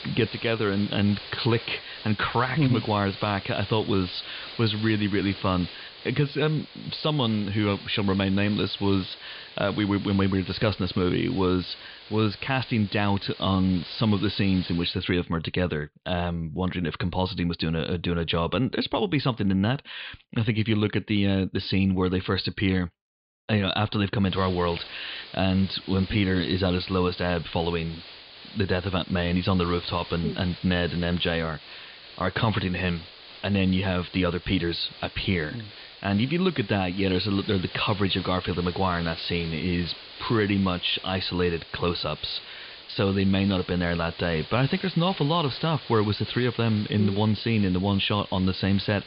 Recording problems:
high frequencies cut off; severe; nothing above 5 kHz
hiss; noticeable; until 15 s and from 24 s on; 15 dB below the speech

